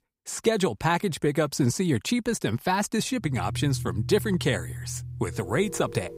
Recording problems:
background music; loud; from 3.5 s on; 10 dB below the speech

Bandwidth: 15.5 kHz